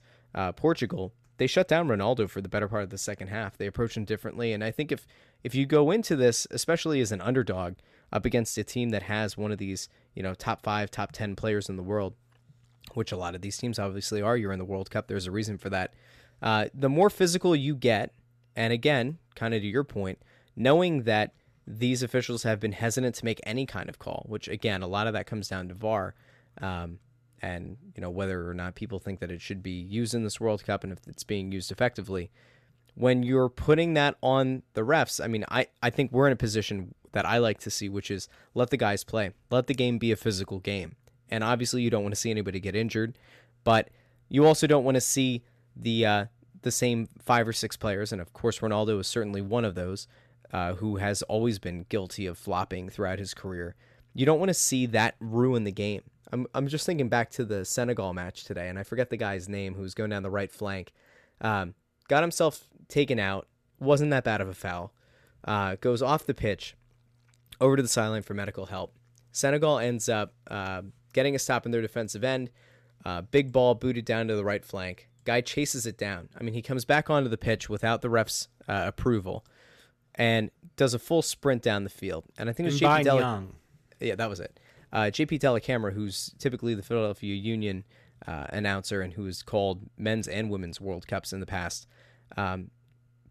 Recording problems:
none

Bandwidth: 14 kHz